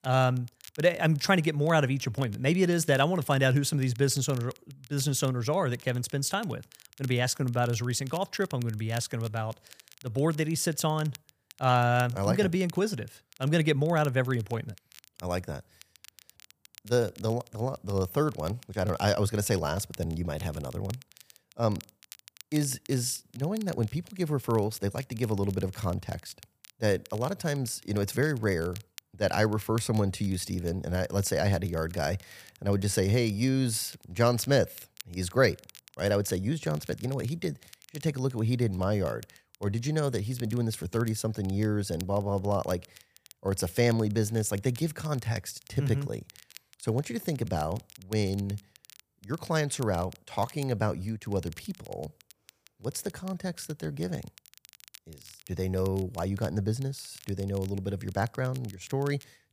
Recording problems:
crackle, like an old record; faint; 20 dB below the speech

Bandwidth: 15 kHz